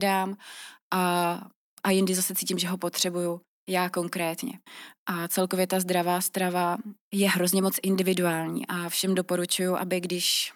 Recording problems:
abrupt cut into speech; at the start

